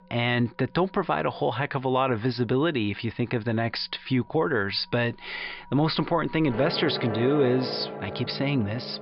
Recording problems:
high frequencies cut off; noticeable; nothing above 5 kHz
background music; loud; throughout; 8 dB below the speech

